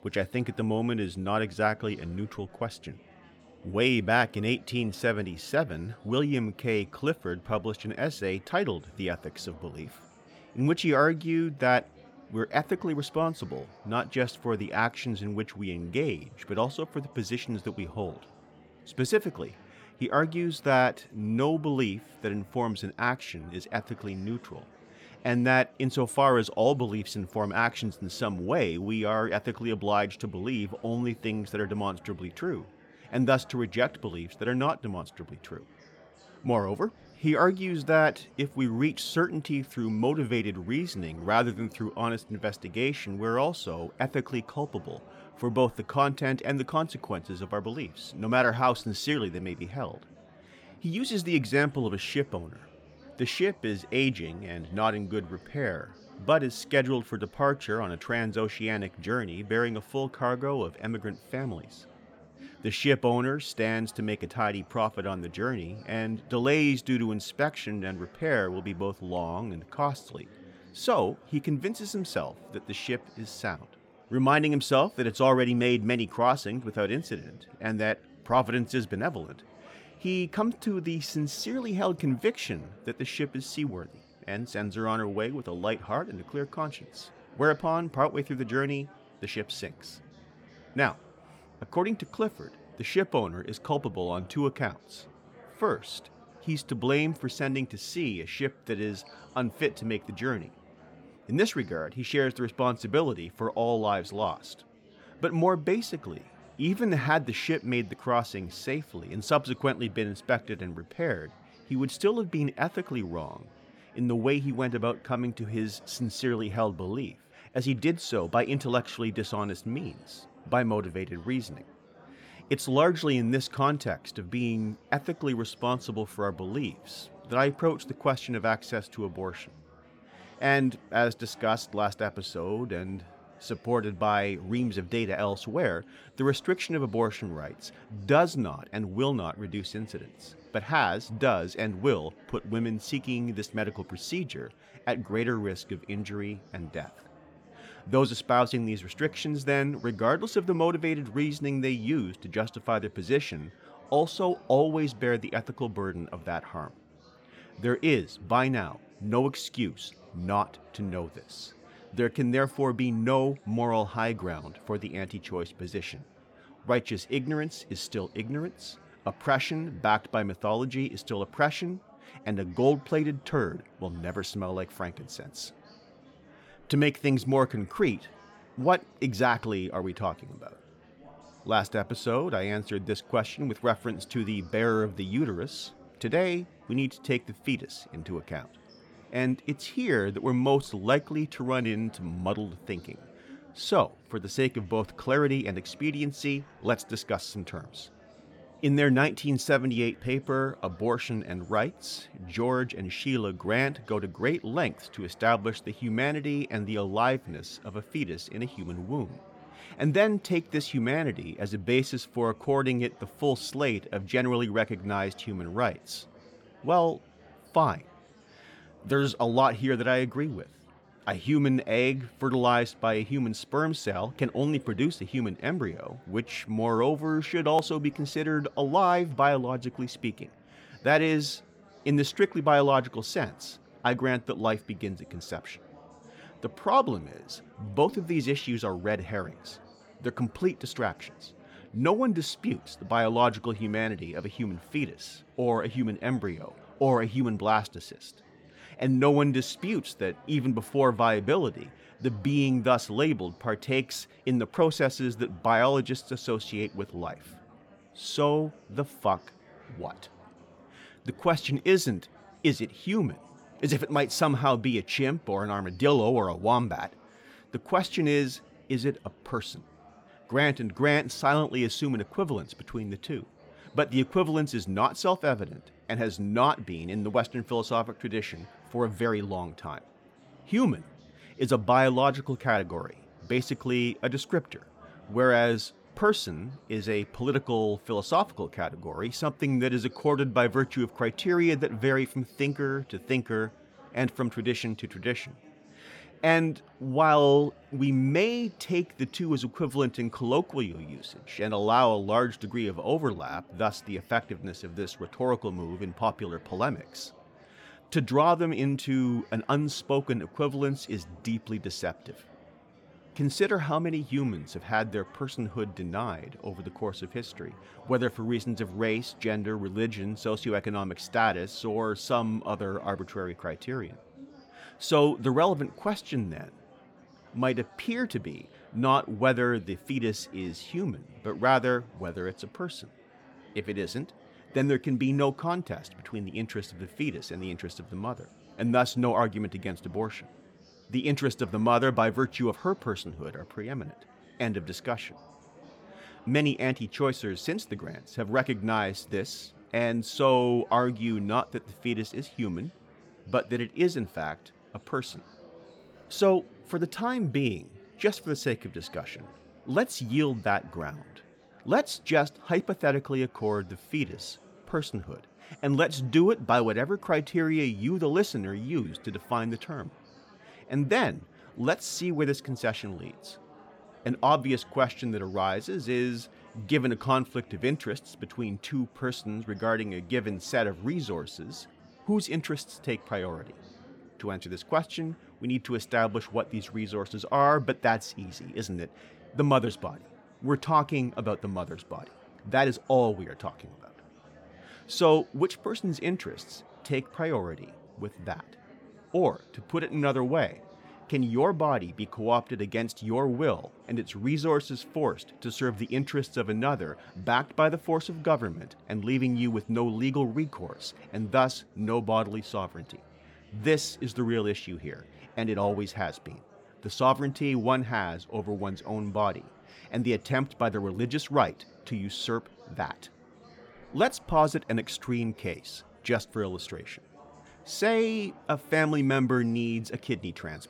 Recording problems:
chatter from many people; faint; throughout; 25 dB below the speech

